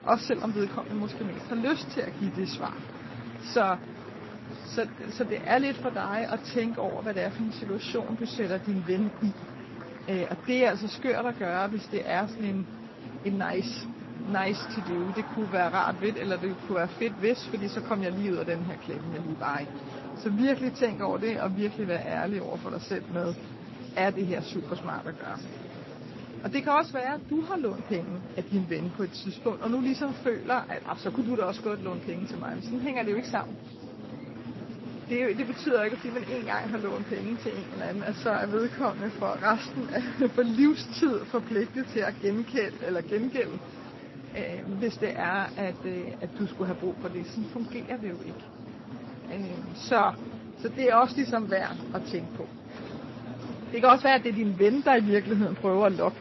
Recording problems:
garbled, watery; slightly; nothing above 5.5 kHz
murmuring crowd; noticeable; throughout; 10 dB below the speech

